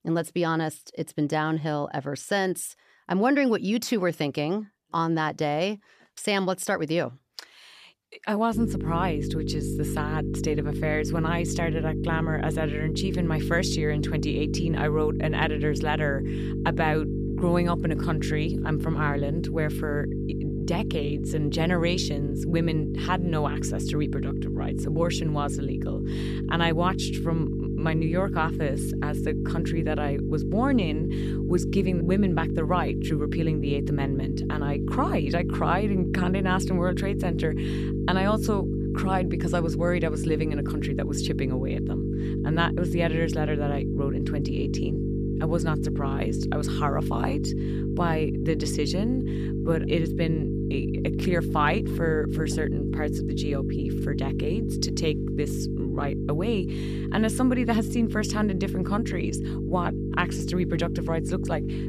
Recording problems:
electrical hum; loud; from 8.5 s on; 50 Hz, 6 dB below the speech

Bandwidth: 14.5 kHz